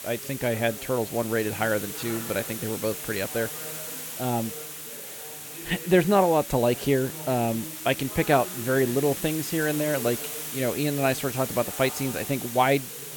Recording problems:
hiss; loud; throughout; 8 dB below the speech
background chatter; noticeable; throughout; 3 voices, 20 dB below the speech

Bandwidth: 17.5 kHz